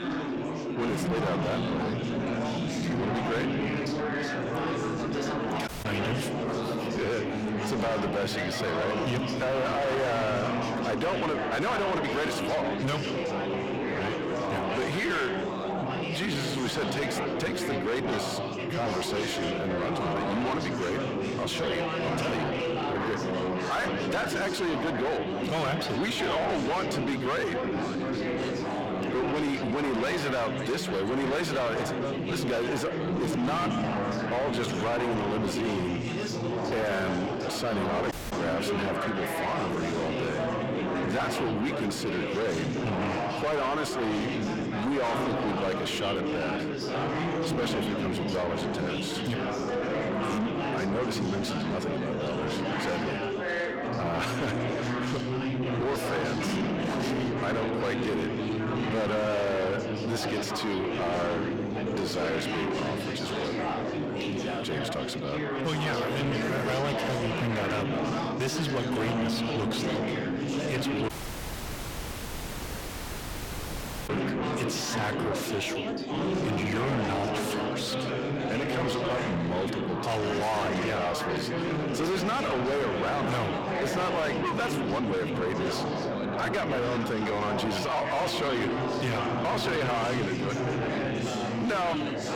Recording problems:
distortion; heavy; 5 dB below the speech
echo of what is said; noticeable; throughout; 150 ms later, 15 dB below the speech
chatter from many people; loud; throughout; as loud as the speech
audio cutting out; at 5.5 s, at 38 s and at 1:11 for 3 s

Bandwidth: 18 kHz